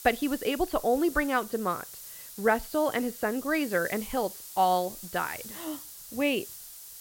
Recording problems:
high frequencies cut off; noticeable; nothing above 5 kHz
hiss; noticeable; throughout; 10 dB below the speech

